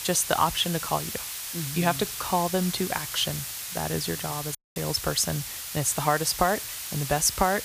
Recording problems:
hiss; loud; throughout; 6 dB below the speech
audio cutting out; at 4.5 s

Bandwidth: 15 kHz